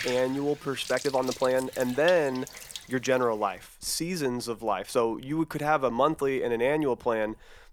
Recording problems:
household noises; noticeable; throughout; 15 dB below the speech
uneven, jittery; strongly; from 0.5 to 5 s

